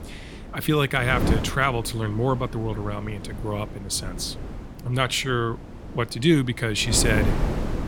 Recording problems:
wind noise on the microphone; occasional gusts; 10 dB below the speech

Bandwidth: 17.5 kHz